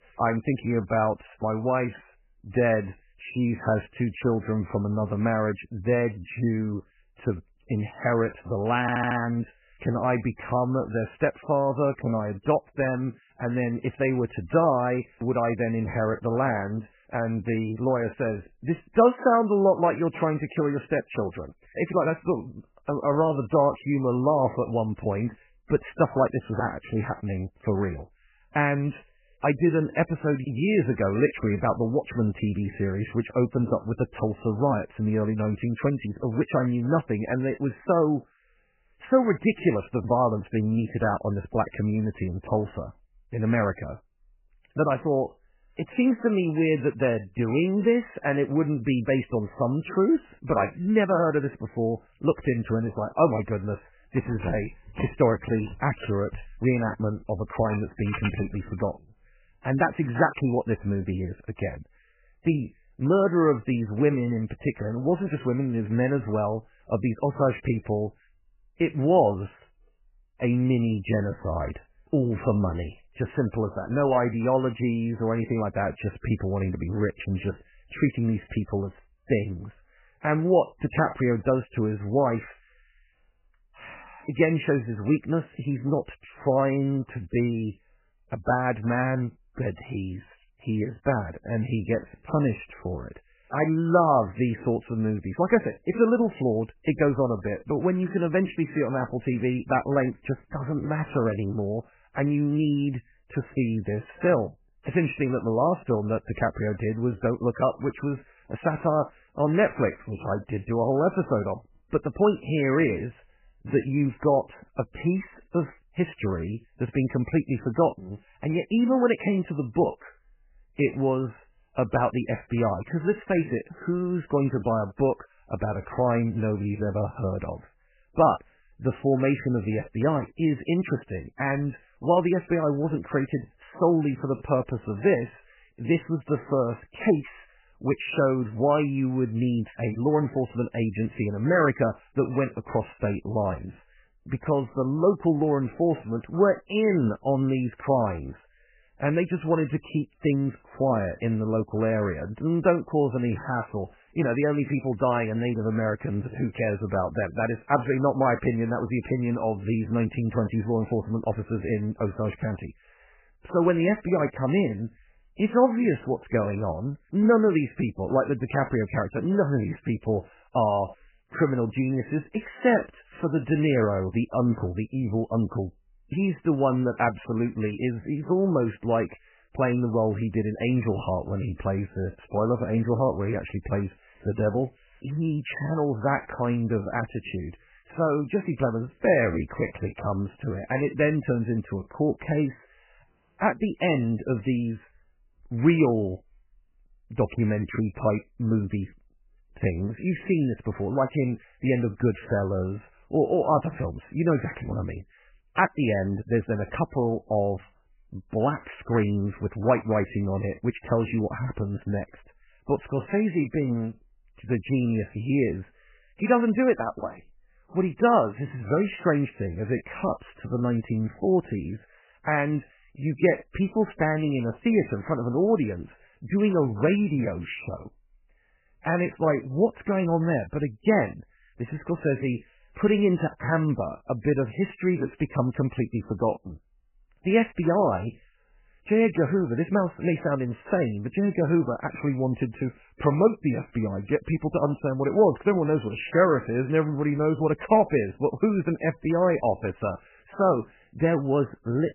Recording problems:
garbled, watery; badly; nothing above 3 kHz
audio stuttering; at 9 s
jangling keys; noticeable; from 54 to 59 s; peak 7 dB below the speech
audio cutting out; at 3:13

